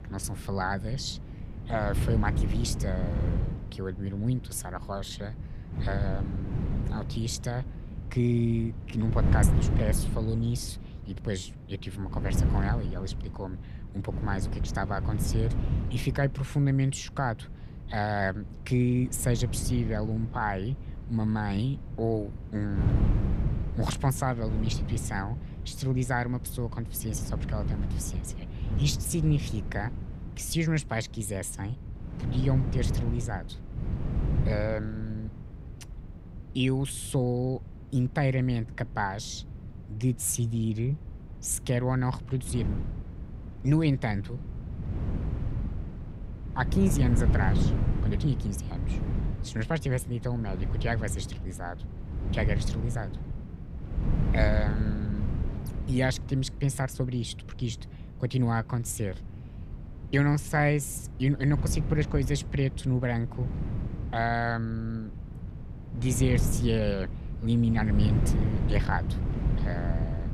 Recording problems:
wind noise on the microphone; heavy; 10 dB below the speech

